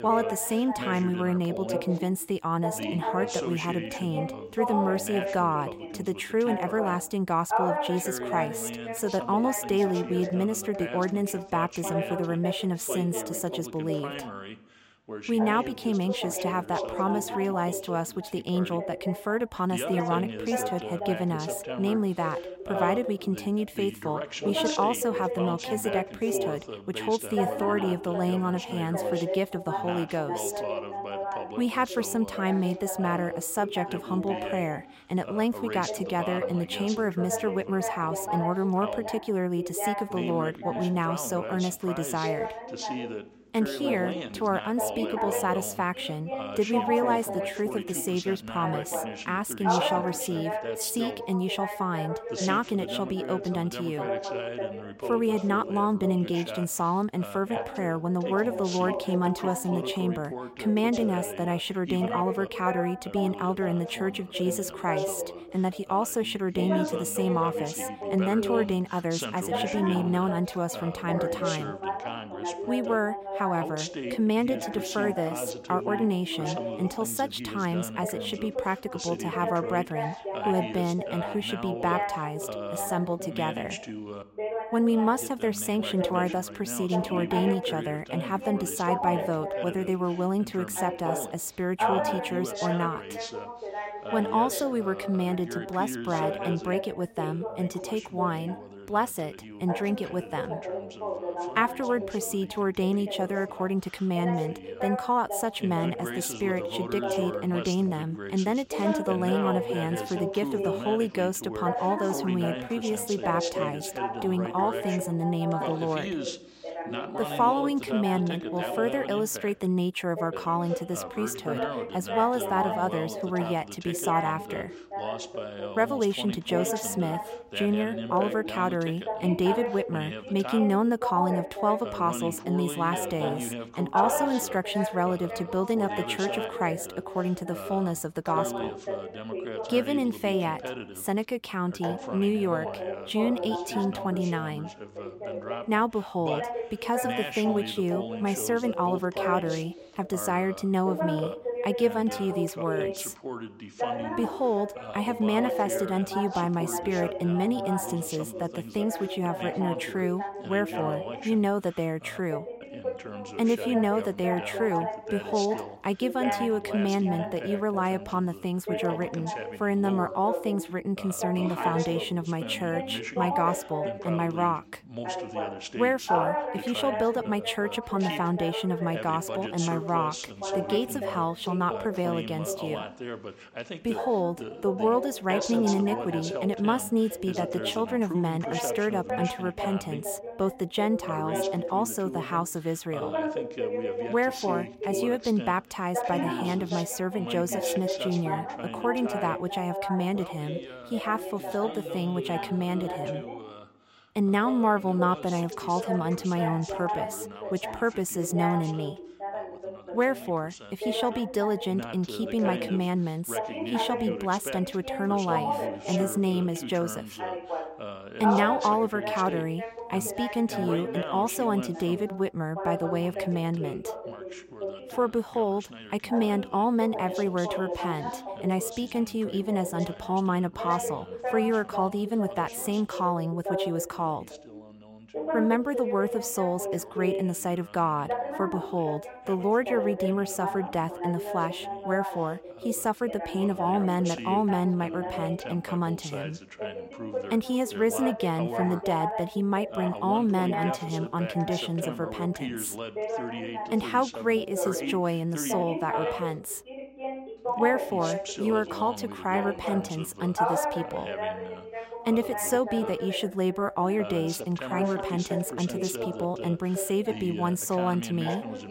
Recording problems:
background chatter; loud; throughout; 2 voices, 5 dB below the speech

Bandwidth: 16 kHz